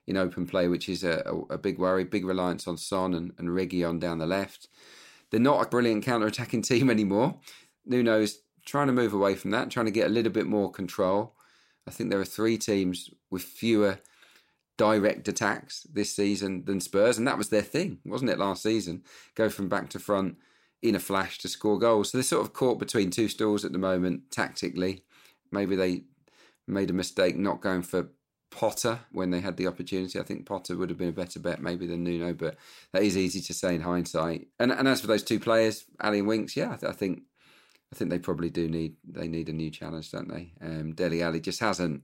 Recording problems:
none

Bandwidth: 16 kHz